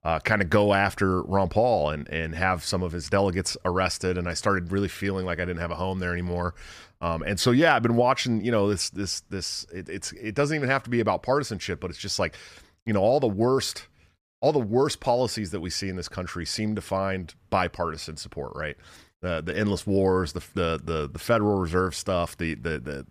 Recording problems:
none

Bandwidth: 14.5 kHz